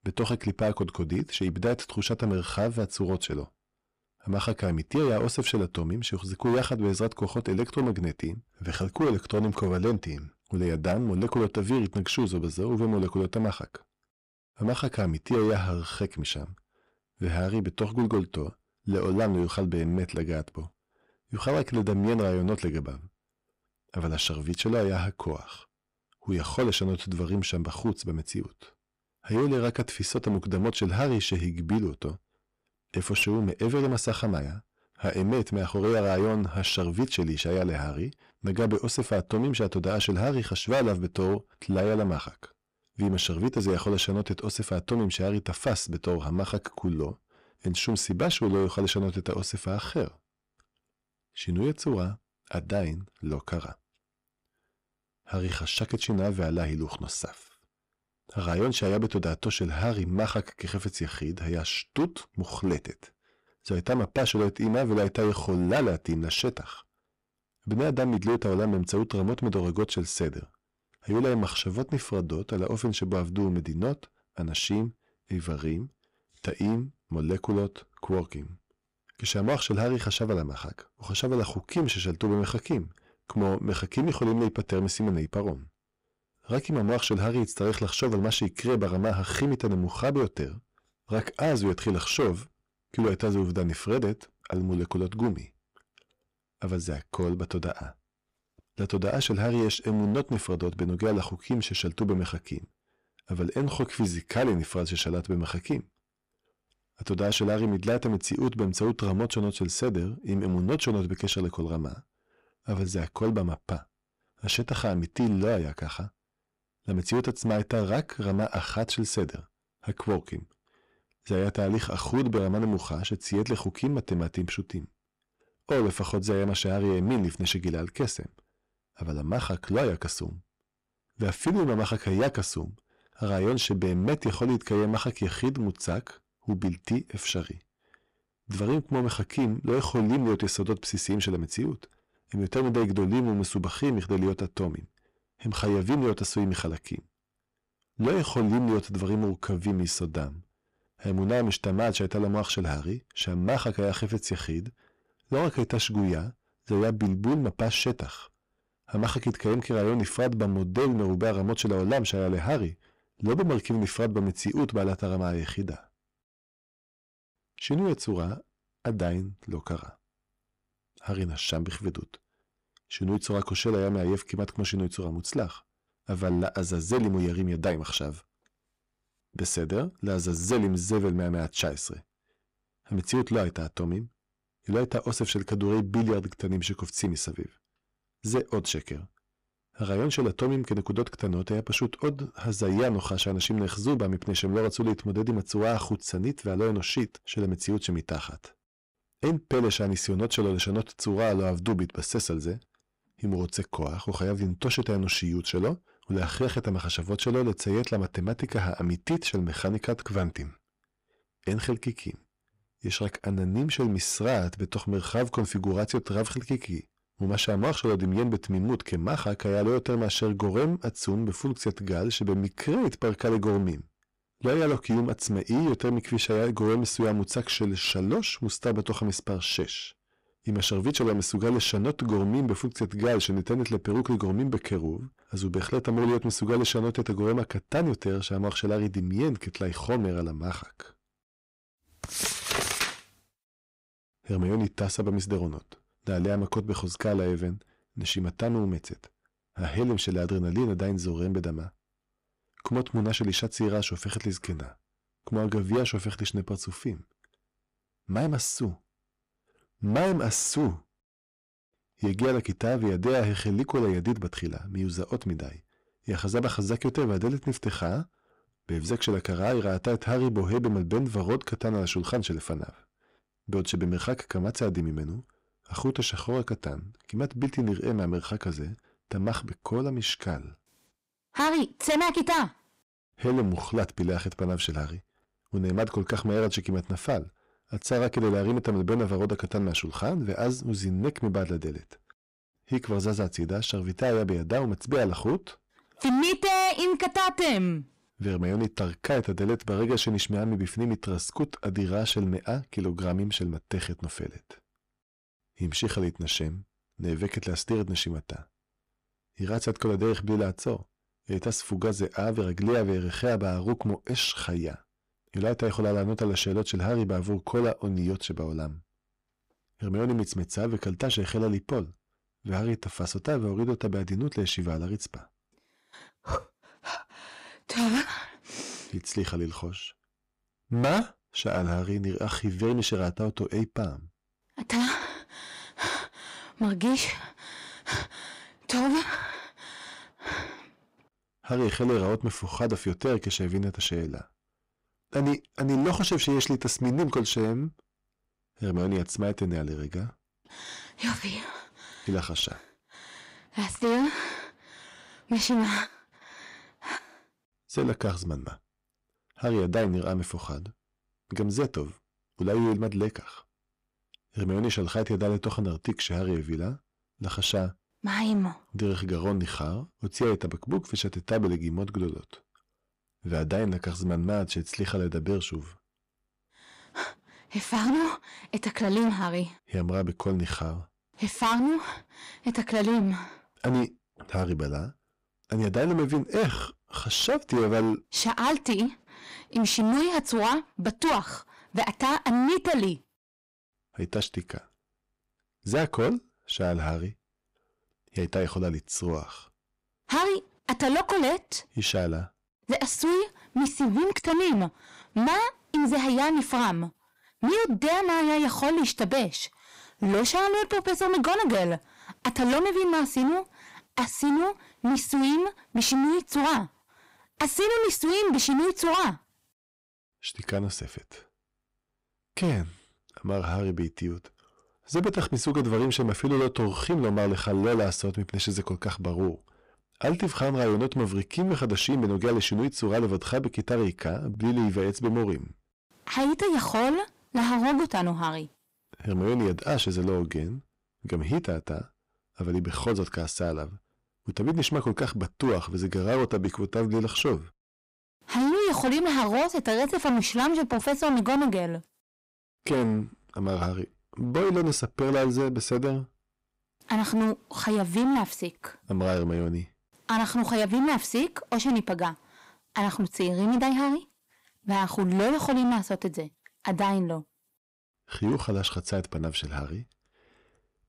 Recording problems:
distortion; heavy; 11% of the sound clipped

